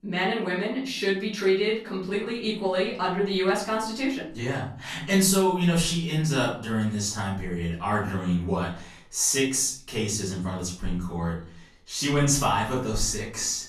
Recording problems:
off-mic speech; far
room echo; slight; dies away in 0.4 s

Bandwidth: 13.5 kHz